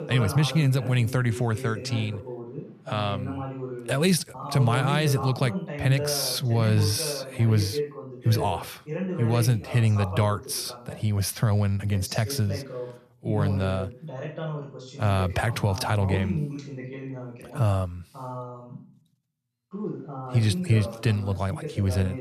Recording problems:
voice in the background; loud; throughout; 9 dB below the speech

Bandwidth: 14 kHz